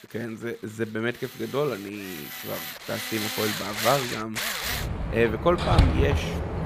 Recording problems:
machinery noise; very loud; throughout; 1 dB above the speech

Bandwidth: 15 kHz